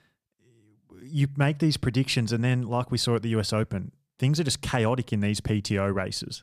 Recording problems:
none

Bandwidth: 15 kHz